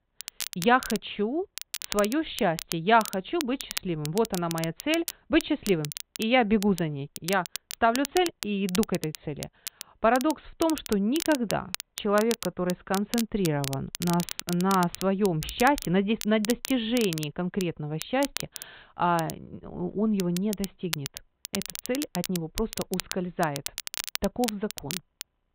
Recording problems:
high frequencies cut off; severe; nothing above 4 kHz
crackle, like an old record; loud; 9 dB below the speech

